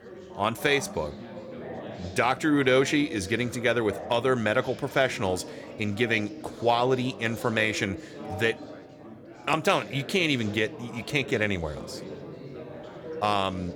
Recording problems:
chatter from many people; noticeable; throughout; 15 dB below the speech

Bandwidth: 18.5 kHz